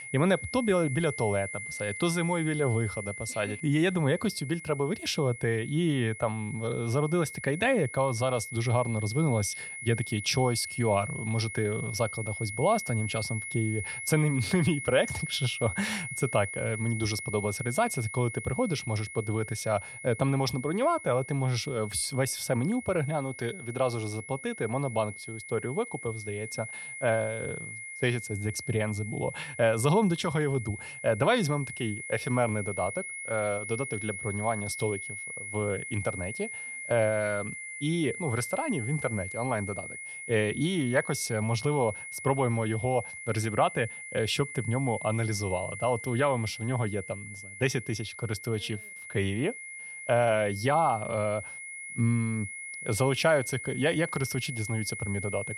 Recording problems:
high-pitched whine; loud; throughout; 2 kHz, 9 dB below the speech

